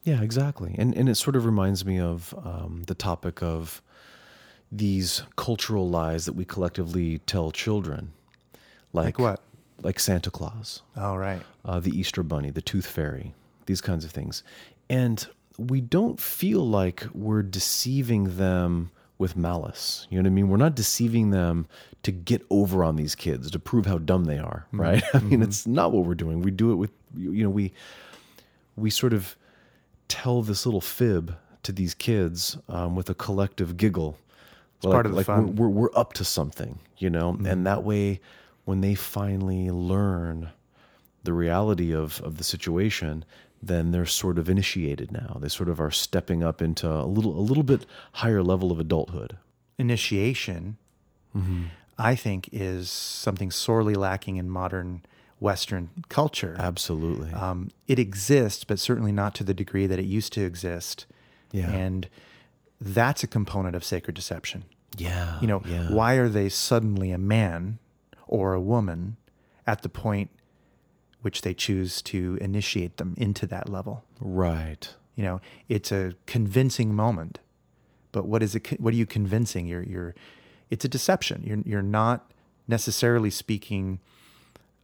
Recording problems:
none

